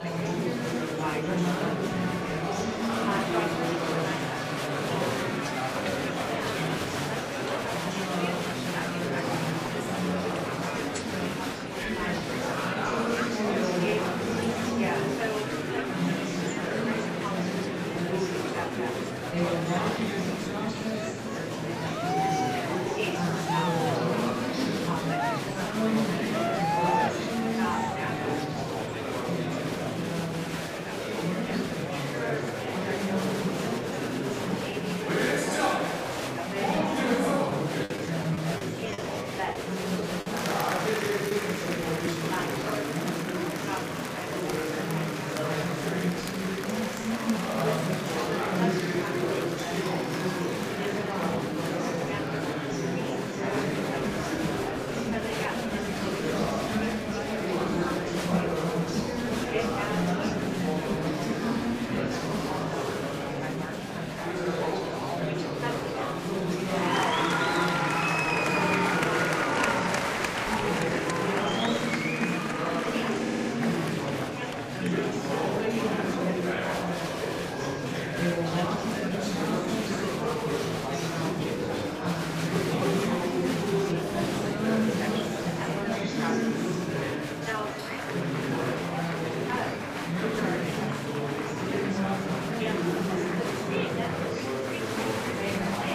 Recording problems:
room echo; strong; dies away in 1.3 s
off-mic speech; far
echo of what is said; noticeable; from 50 s on; 510 ms later, 15 dB below the speech
murmuring crowd; very loud; throughout; 4 dB above the speech
choppy; occasionally; from 38 to 42 s; 5% of the speech affected
audio stuttering; at 1:13

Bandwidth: 15 kHz